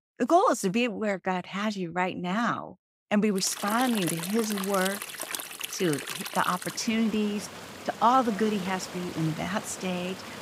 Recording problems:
rain or running water; loud; from 3.5 s on; 8 dB below the speech

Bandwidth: 15.5 kHz